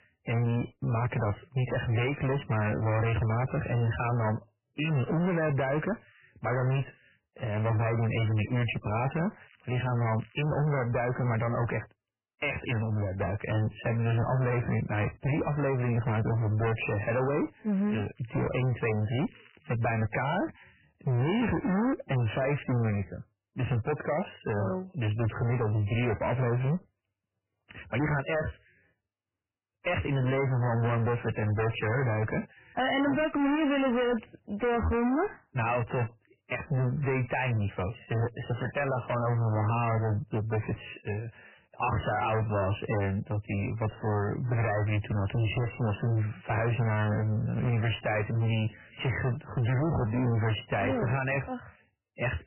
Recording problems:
distortion; heavy; 25% of the sound clipped
garbled, watery; badly; nothing above 3 kHz
crackling; faint; from 9.5 to 12 s and from 18 to 20 s; 30 dB below the speech

